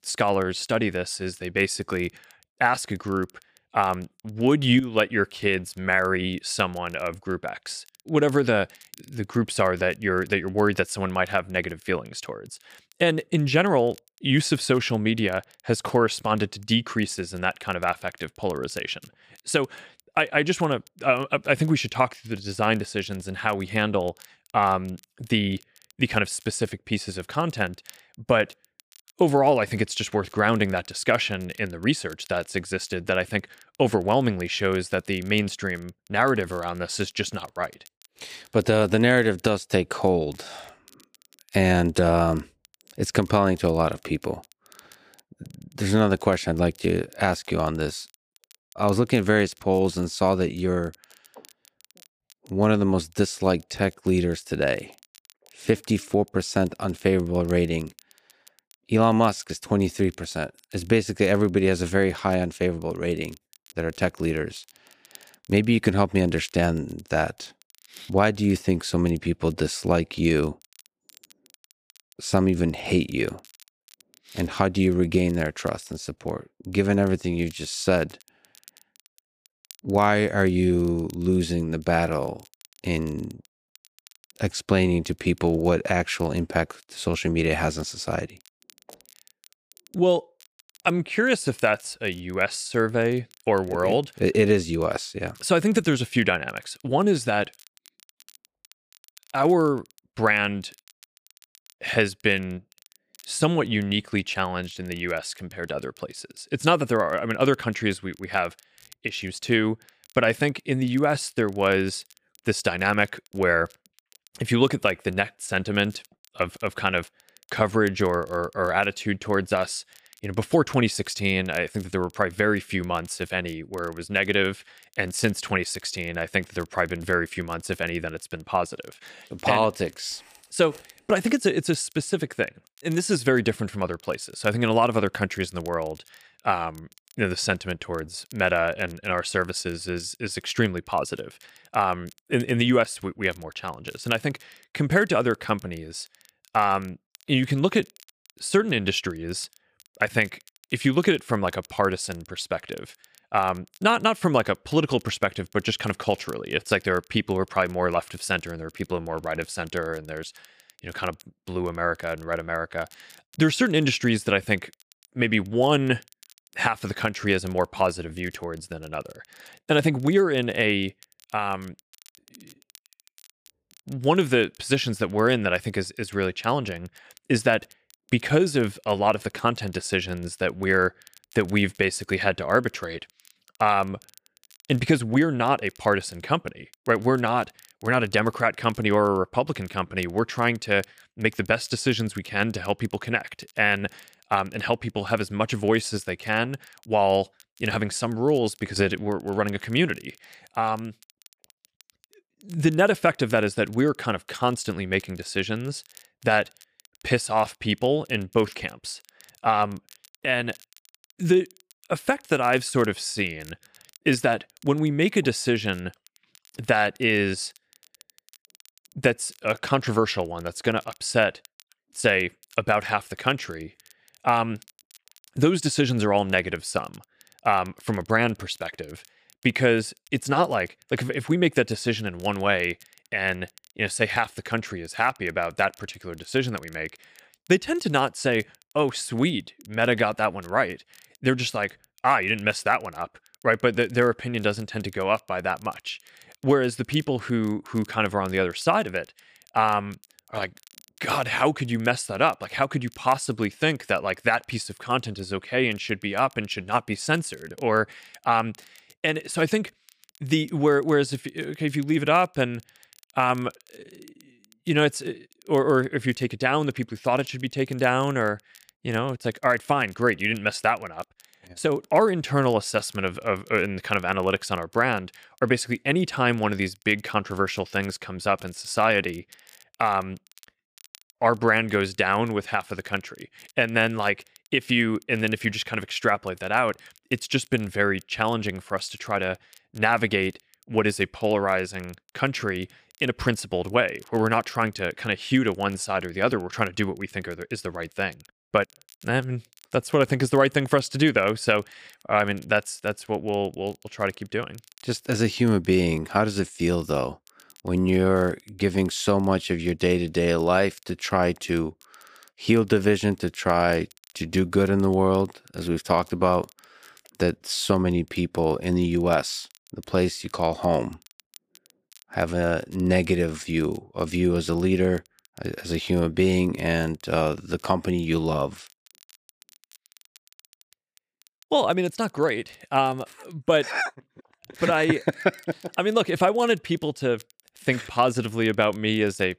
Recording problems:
crackle, like an old record; faint; 30 dB below the speech

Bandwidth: 15 kHz